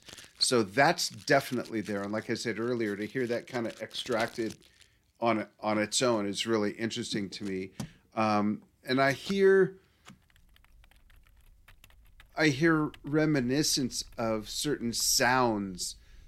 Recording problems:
household noises; faint; throughout; 25 dB below the speech

